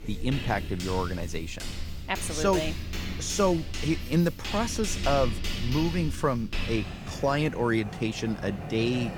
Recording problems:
household noises; loud; throughout; 7 dB below the speech

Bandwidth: 18 kHz